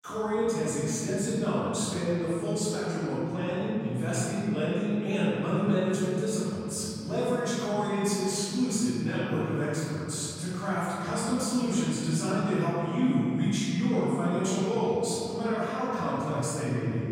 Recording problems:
room echo; strong; dies away in 2.7 s
off-mic speech; far

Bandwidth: 16 kHz